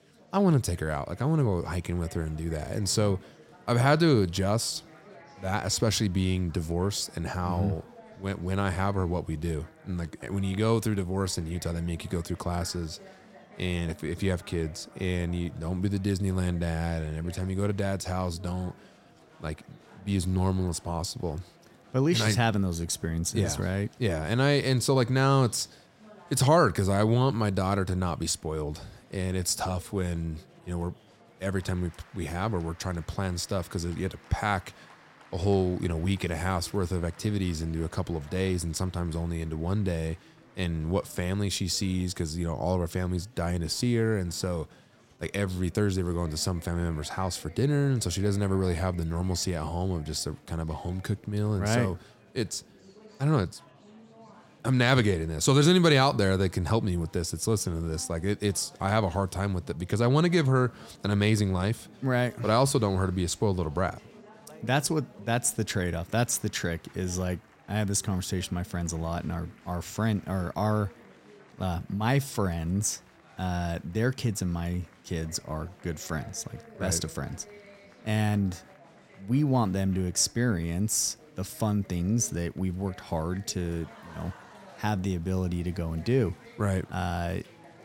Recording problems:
chatter from many people; faint; throughout; 25 dB below the speech

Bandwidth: 16 kHz